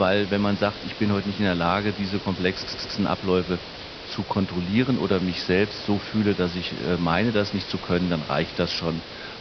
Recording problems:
high frequencies cut off; noticeable; nothing above 5.5 kHz
hiss; noticeable; throughout; 10 dB below the speech
abrupt cut into speech; at the start
audio stuttering; at 2.5 s

